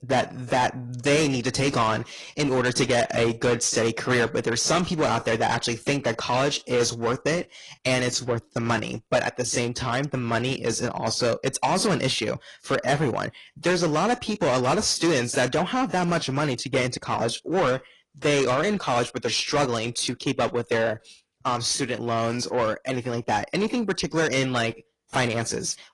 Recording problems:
distortion; heavy; 7 dB below the speech
garbled, watery; slightly; nothing above 10.5 kHz

